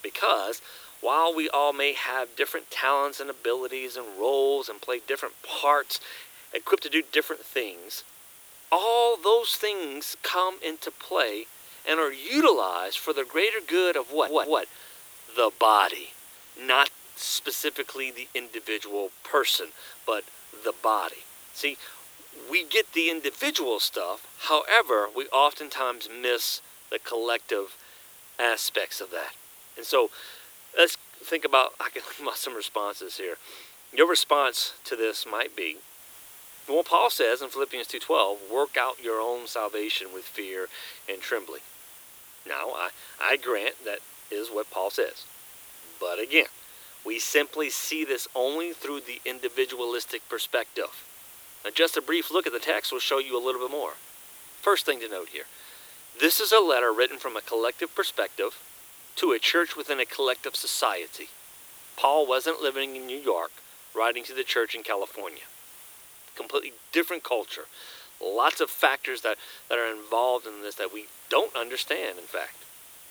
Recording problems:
thin; very; fading below 300 Hz
hiss; noticeable; throughout; 20 dB below the speech
audio stuttering; at 14 s

